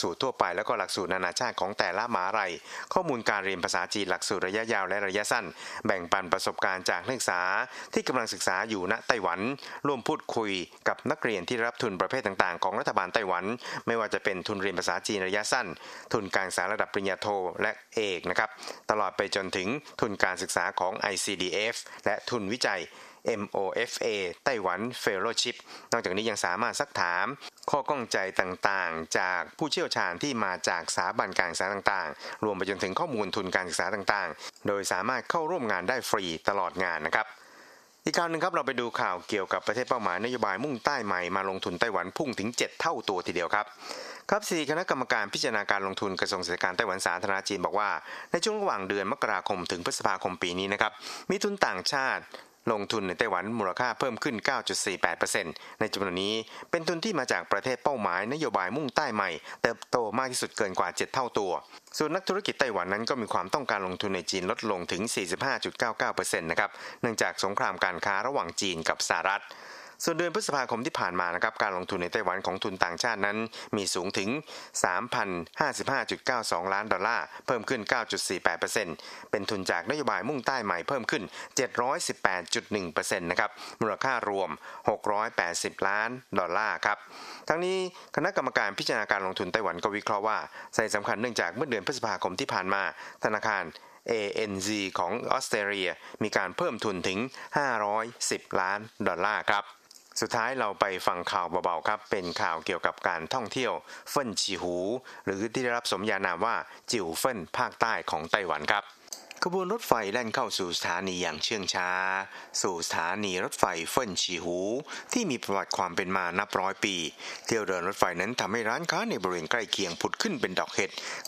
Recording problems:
squashed, flat; heavily
thin; somewhat; fading below 550 Hz

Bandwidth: 14.5 kHz